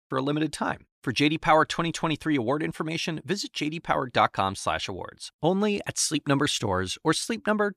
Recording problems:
none

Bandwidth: 14.5 kHz